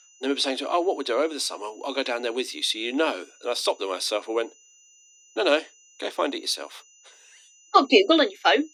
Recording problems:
thin; very slightly; fading below 250 Hz
high-pitched whine; faint; throughout; 6 kHz, 30 dB below the speech

